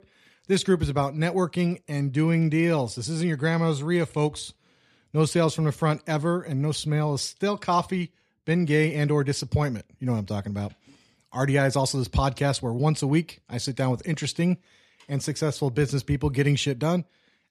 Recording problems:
none

